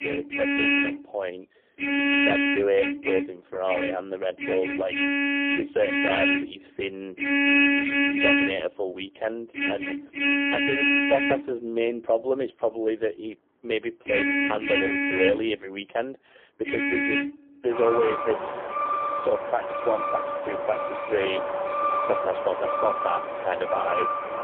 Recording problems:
phone-call audio; poor line; nothing above 3.5 kHz
traffic noise; very loud; throughout; 3 dB above the speech

